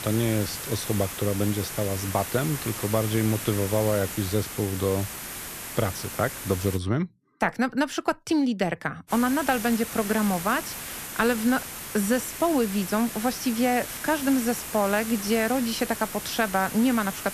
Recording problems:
hiss; loud; until 7 s and from 9 s on; 7 dB below the speech

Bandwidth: 14 kHz